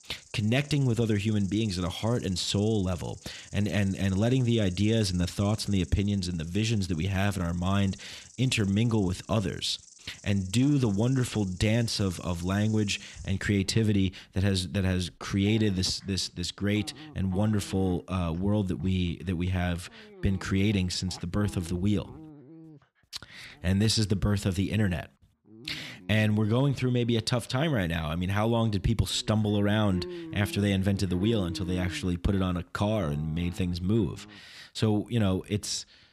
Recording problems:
animal sounds; noticeable; throughout; 20 dB below the speech

